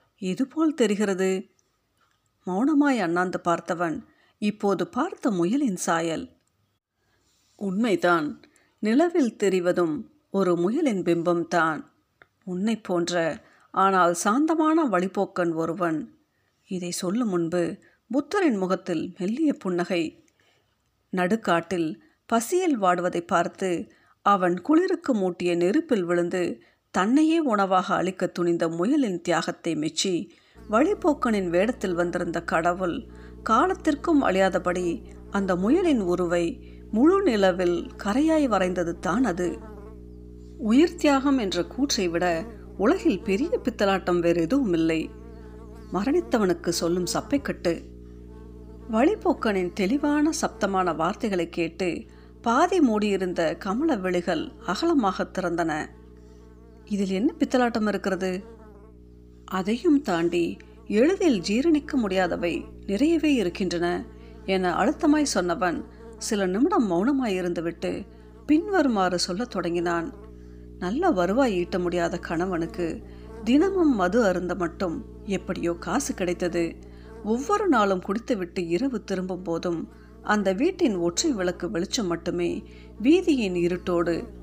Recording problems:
electrical hum; faint; from 31 s on; 60 Hz, 25 dB below the speech

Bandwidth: 15 kHz